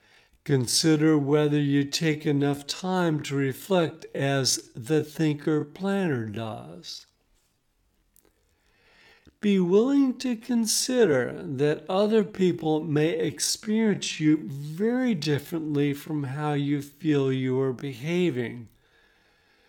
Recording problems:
wrong speed, natural pitch; too slow; 0.6 times normal speed

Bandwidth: 17.5 kHz